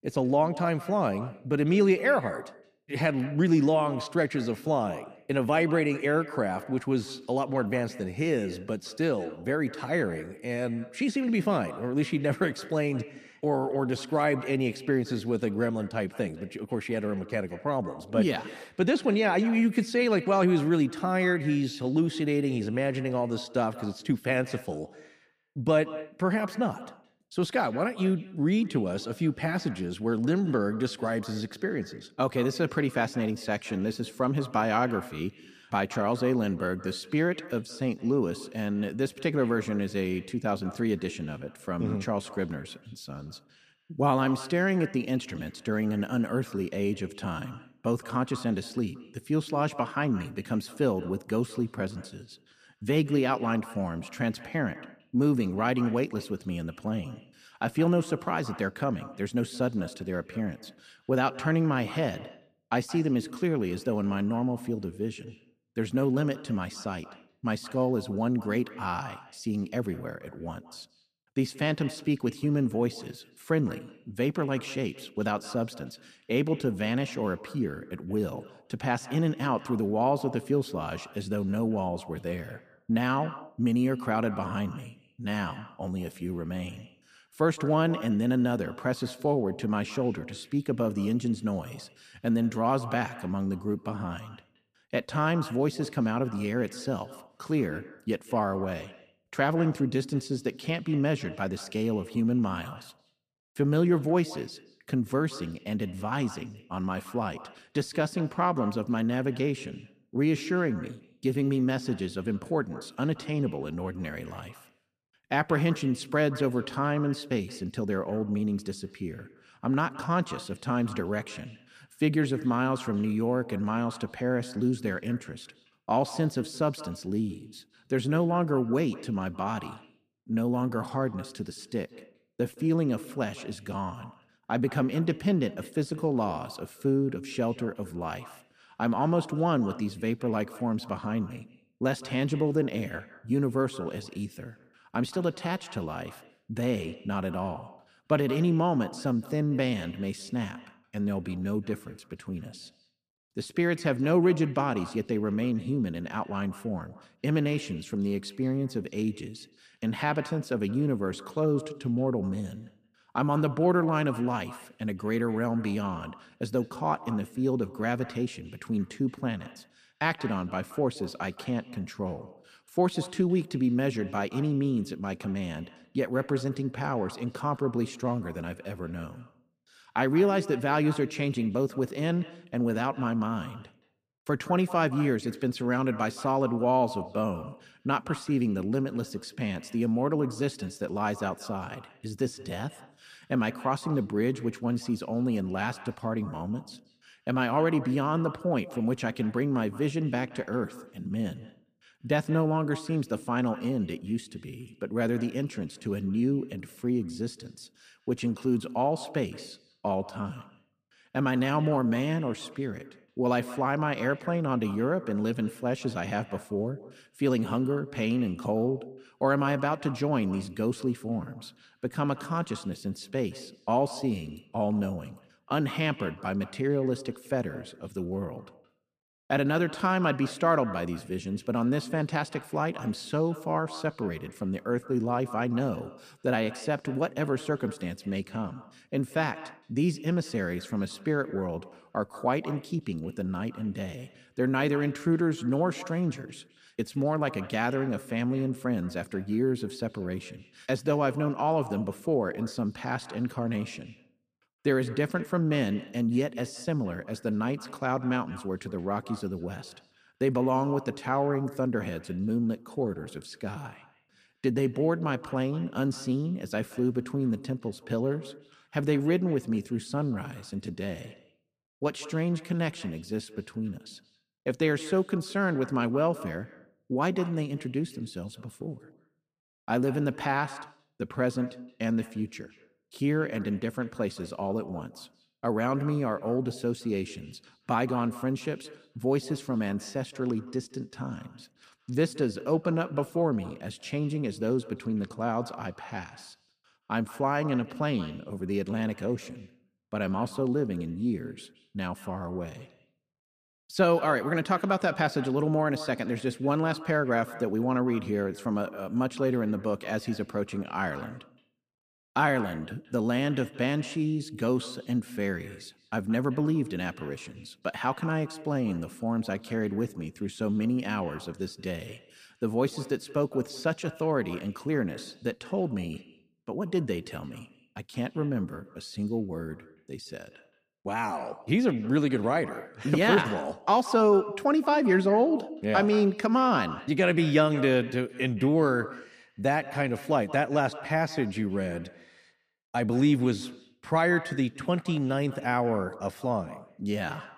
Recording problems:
echo of what is said; noticeable; throughout; 170 ms later, 15 dB below the speech

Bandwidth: 15 kHz